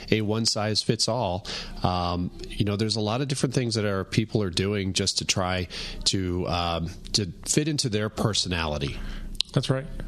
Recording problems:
squashed, flat; somewhat

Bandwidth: 13.5 kHz